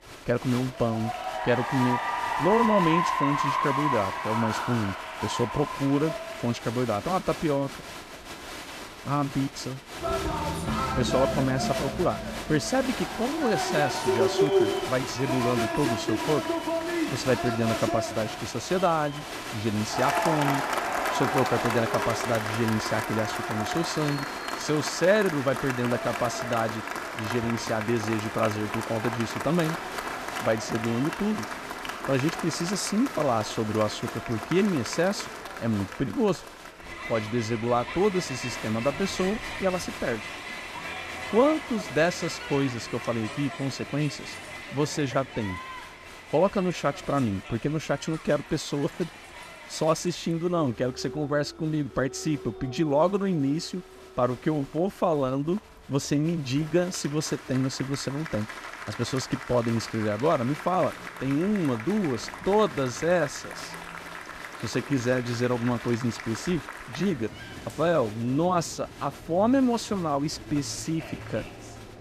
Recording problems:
crowd noise; loud; throughout; 5 dB below the speech

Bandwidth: 14.5 kHz